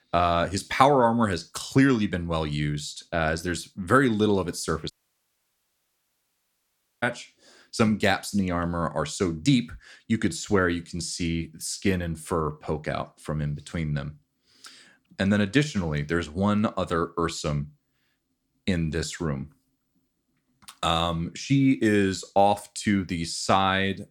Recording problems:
audio cutting out; at 5 s for 2 s

